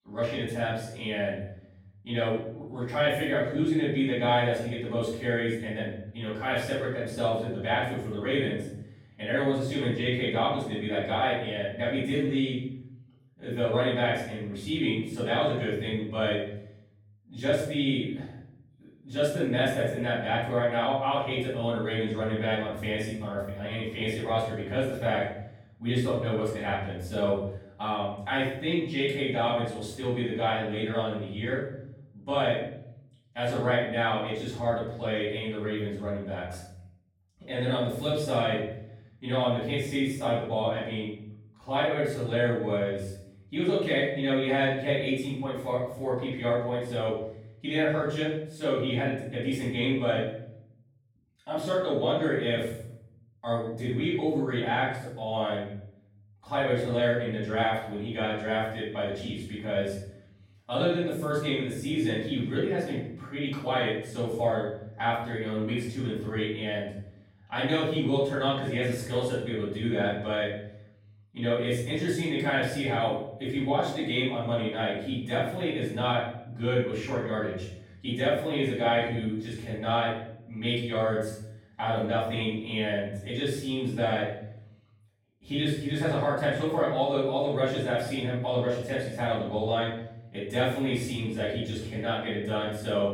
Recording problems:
off-mic speech; far
room echo; noticeable; dies away in 0.7 s

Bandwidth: 17.5 kHz